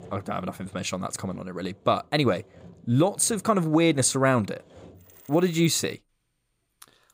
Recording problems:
machinery noise; faint; throughout; 25 dB below the speech

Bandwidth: 15.5 kHz